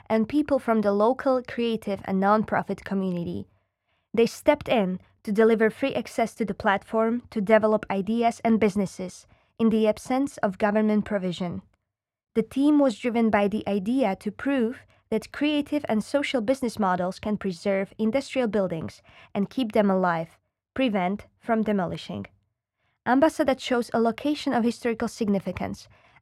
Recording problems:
muffled; slightly; fading above 3 kHz

